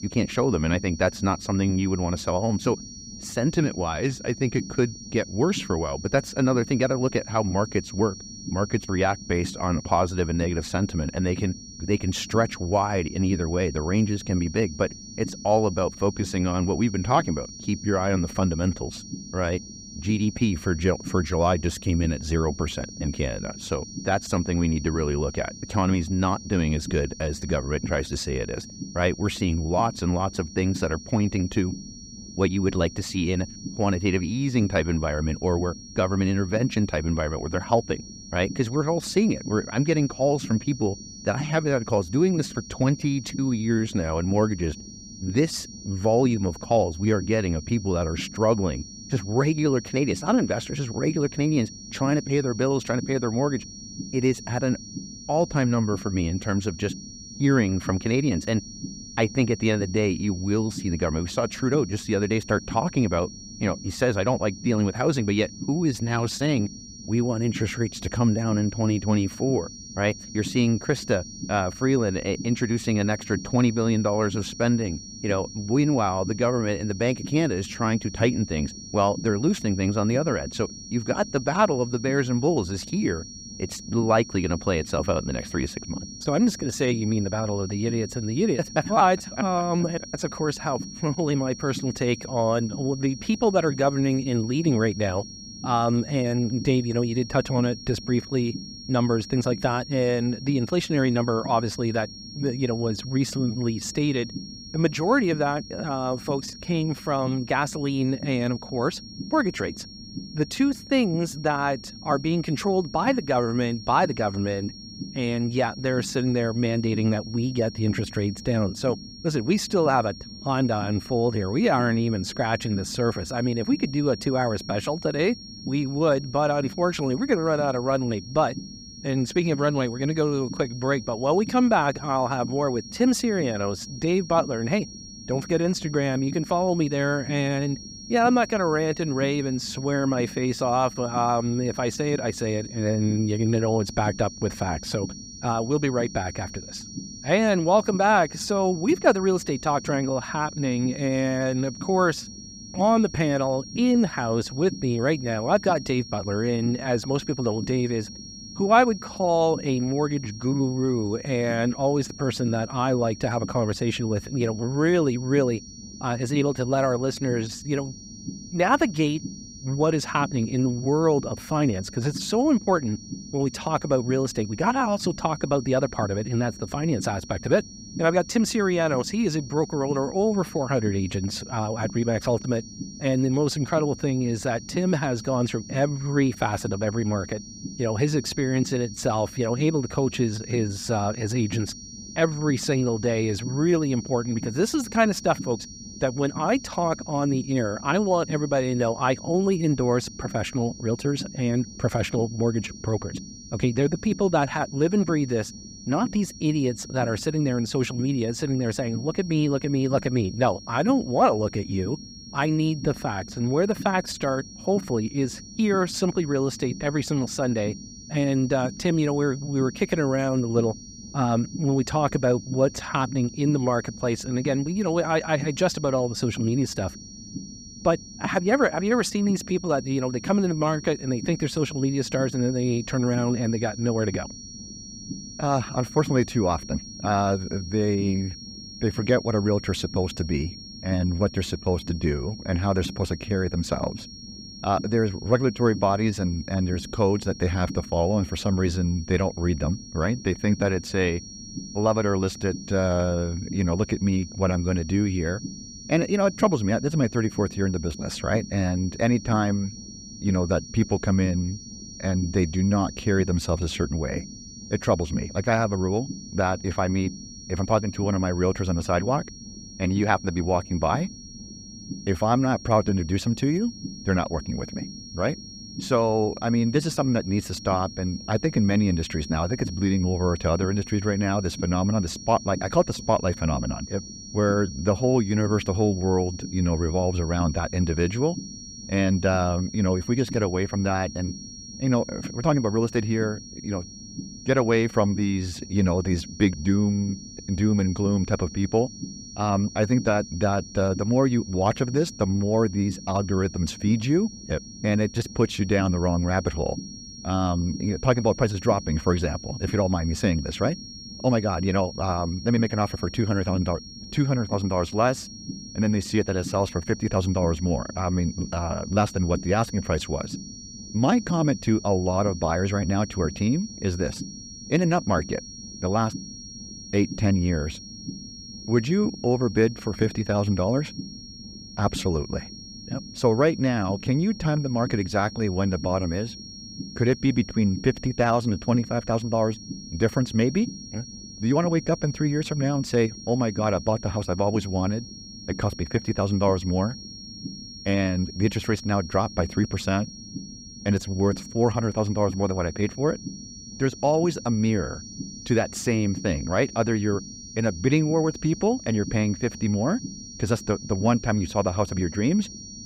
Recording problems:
high-pitched whine; noticeable; throughout; 5.5 kHz, 15 dB below the speech
low rumble; faint; throughout; 20 dB below the speech

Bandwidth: 15.5 kHz